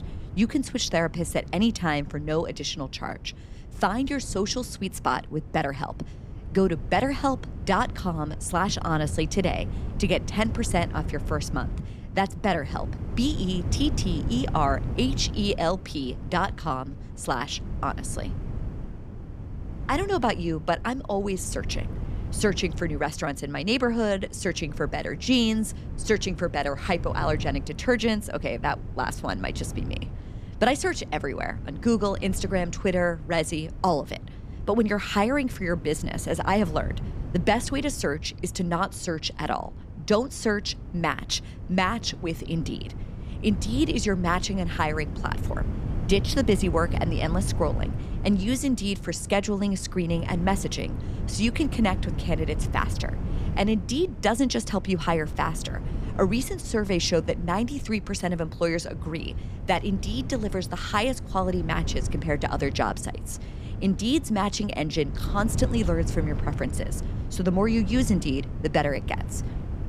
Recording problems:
wind noise on the microphone; occasional gusts; 15 dB below the speech

